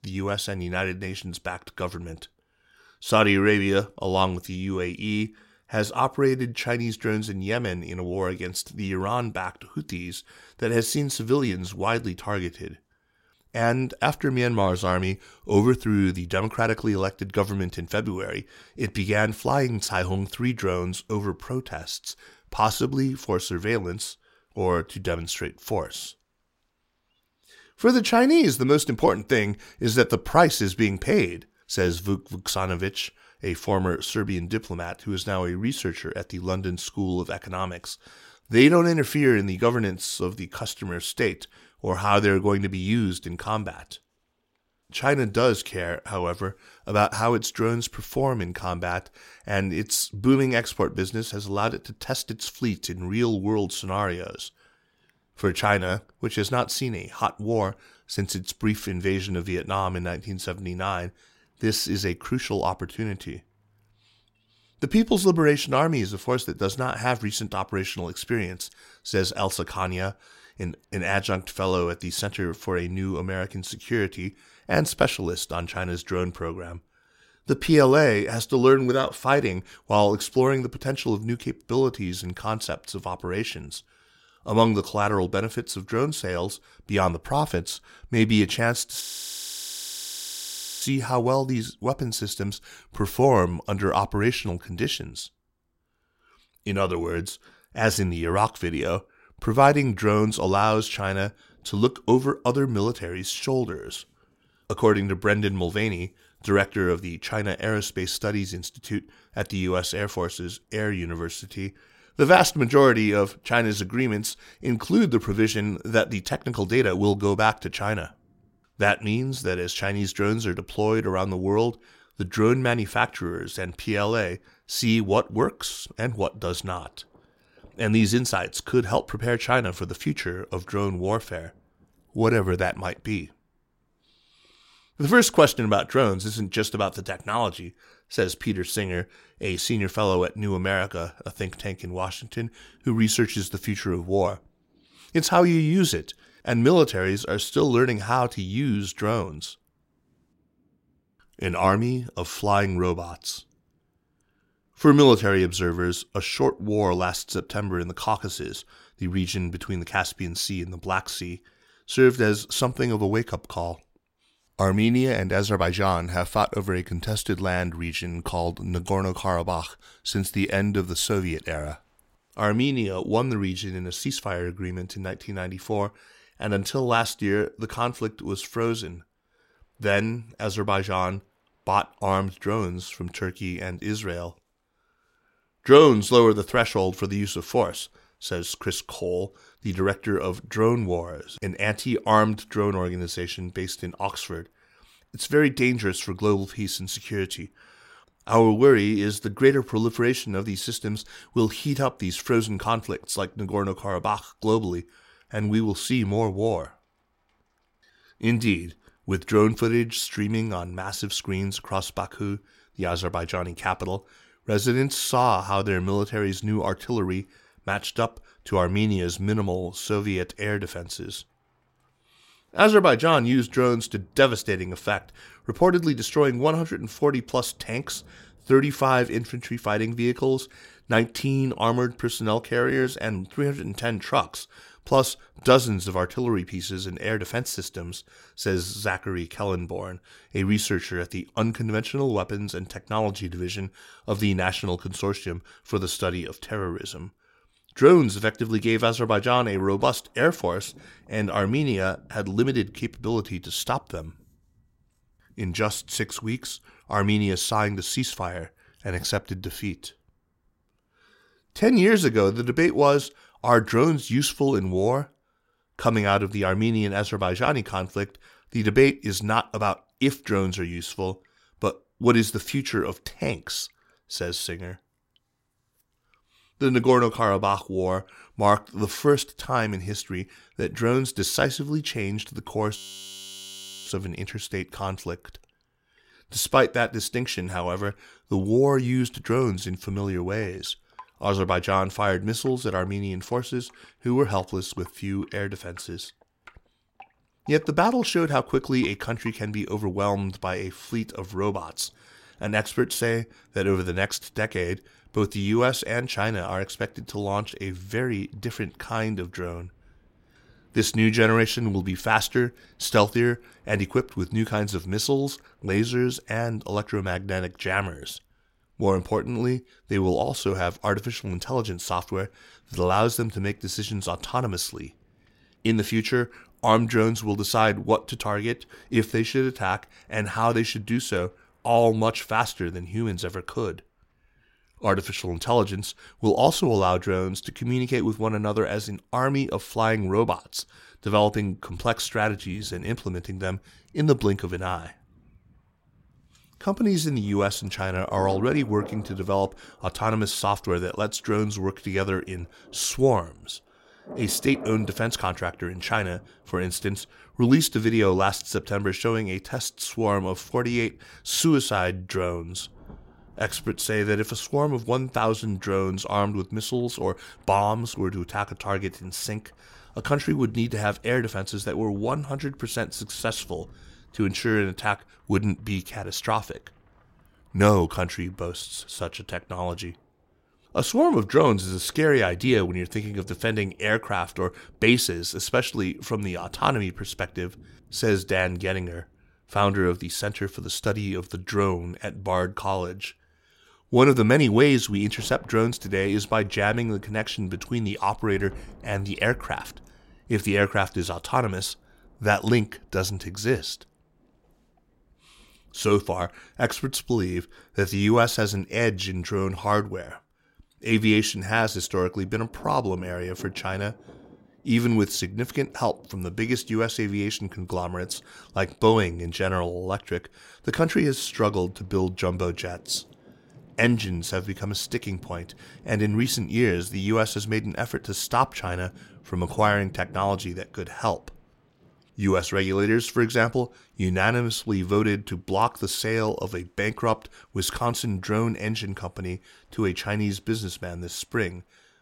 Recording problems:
rain or running water; faint; throughout; 30 dB below the speech
audio freezing; at 1:29 for 2 s and at 4:43 for 1 s

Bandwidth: 16 kHz